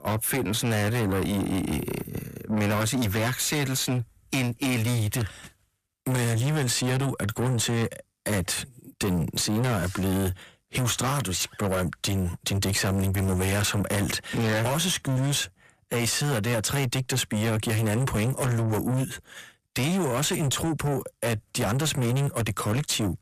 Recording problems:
distortion; heavy; 8 dB below the speech

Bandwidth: 14.5 kHz